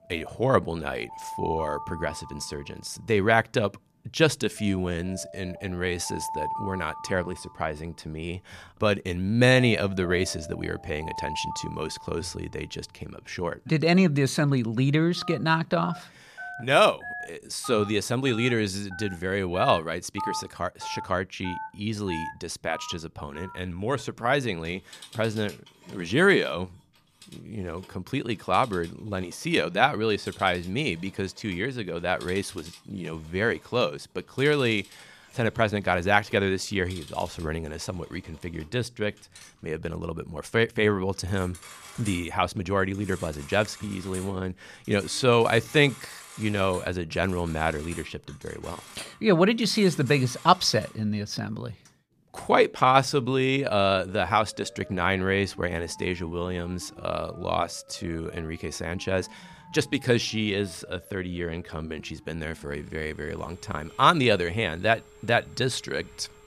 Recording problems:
alarms or sirens; noticeable; throughout; 15 dB below the speech

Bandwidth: 14.5 kHz